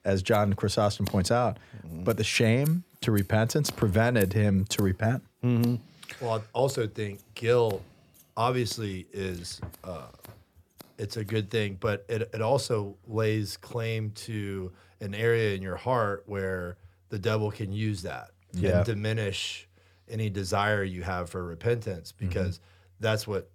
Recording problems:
household noises; noticeable; throughout; 20 dB below the speech

